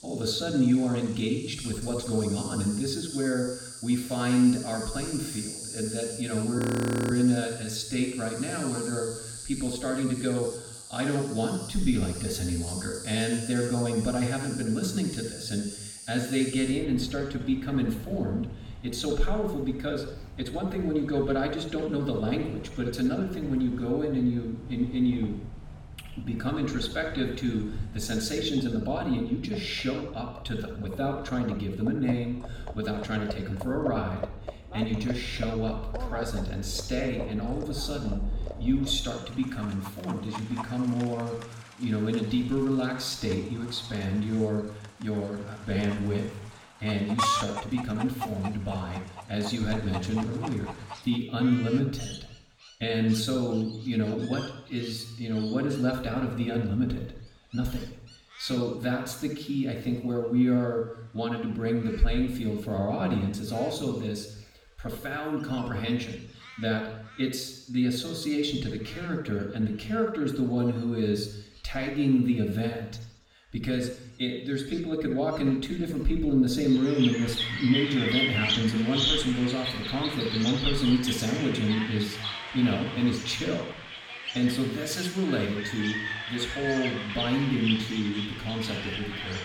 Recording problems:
off-mic speech; far
room echo; noticeable; dies away in 0.7 s
animal sounds; loud; throughout; 7 dB below the speech
audio freezing; at 6.5 s for 0.5 s

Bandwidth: 17 kHz